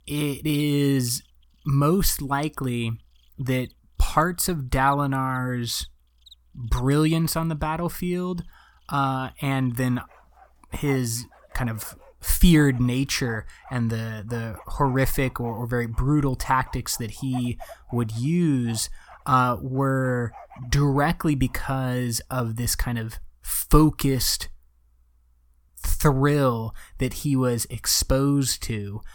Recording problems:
animal sounds; faint; until 22 s; 25 dB below the speech

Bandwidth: 18 kHz